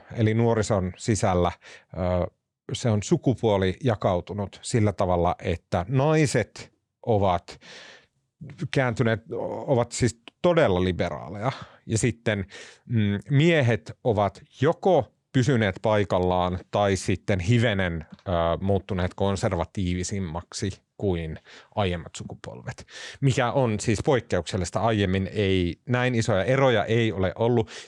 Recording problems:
none

